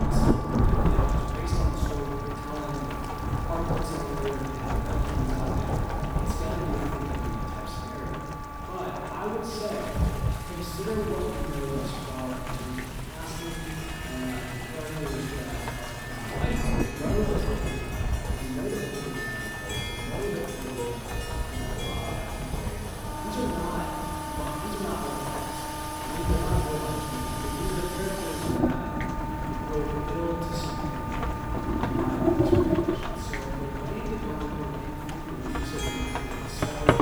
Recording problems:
room echo; strong; dies away in 1.7 s
off-mic speech; far
household noises; very loud; throughout; as loud as the speech
rain or running water; very loud; throughout; 2 dB above the speech
background music; loud; throughout; 3 dB below the speech

